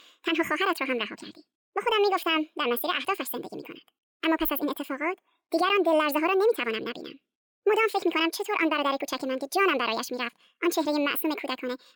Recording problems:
wrong speed and pitch; too fast and too high; 1.7 times normal speed

